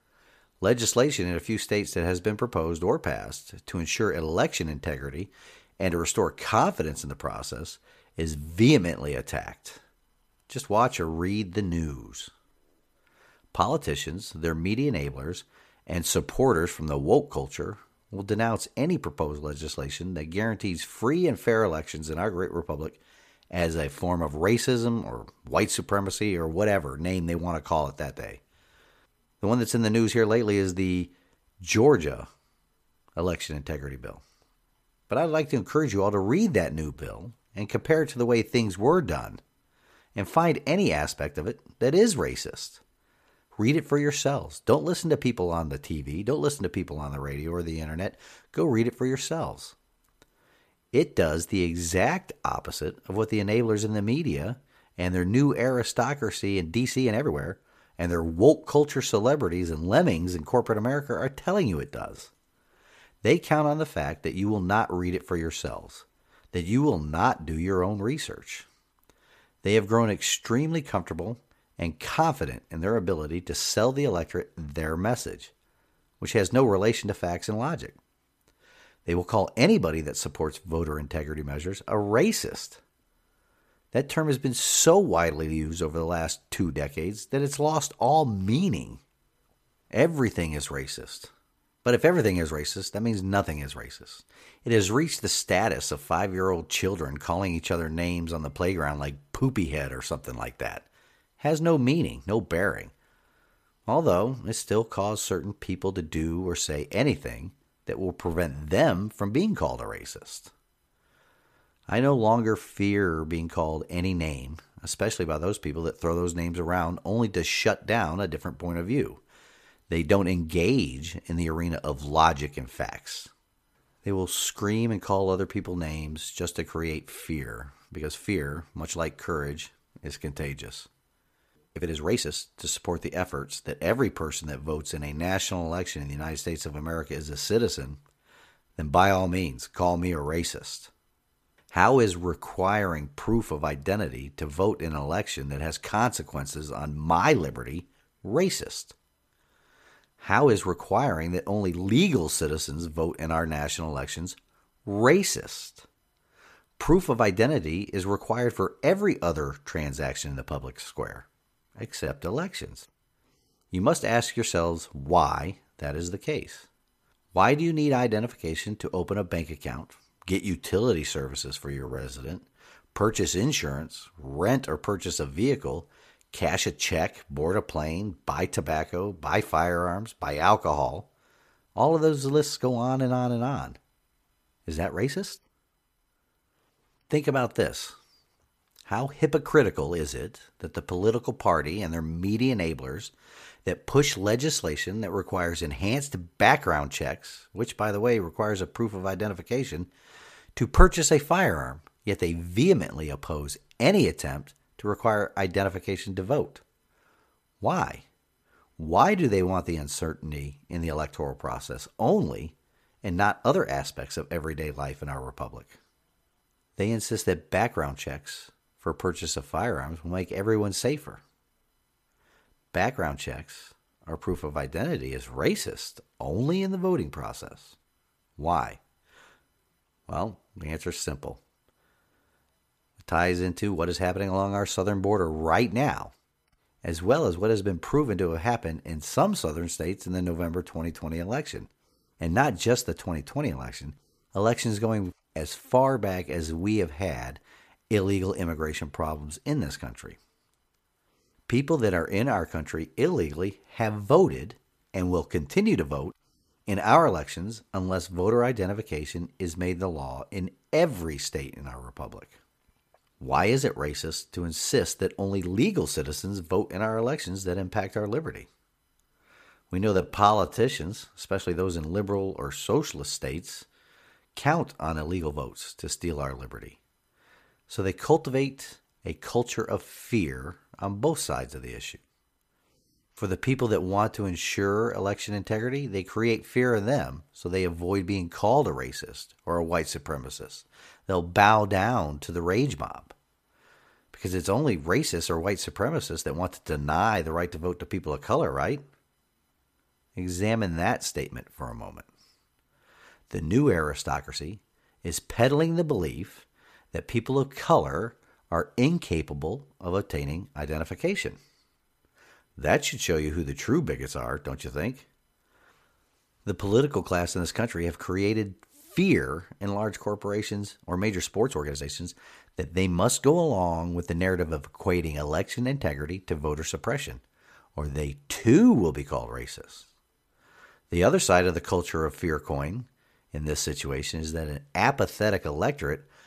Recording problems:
uneven, jittery; strongly; from 37 s to 5:29

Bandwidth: 14.5 kHz